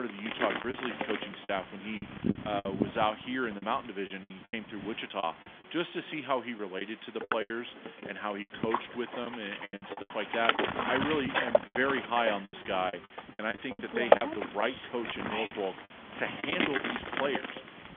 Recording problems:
phone-call audio; nothing above 3.5 kHz
wind noise on the microphone; heavy; 1 dB above the speech
hiss; noticeable; throughout; 20 dB below the speech
choppy; very; 10% of the speech affected
abrupt cut into speech; at the start

